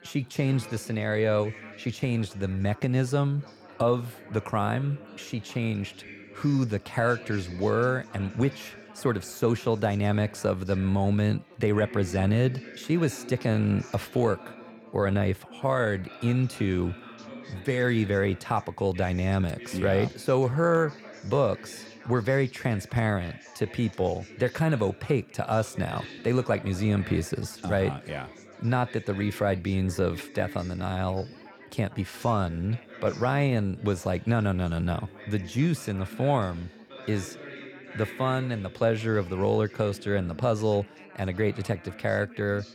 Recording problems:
background chatter; noticeable; throughout; 4 voices, 15 dB below the speech

